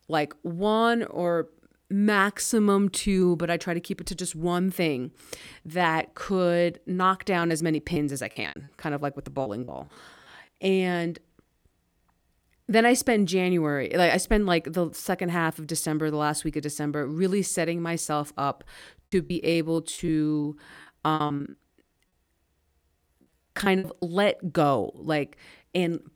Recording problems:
choppy; very; from 7.5 to 9.5 s, from 19 to 21 s and at 23 s; 18% of the speech affected

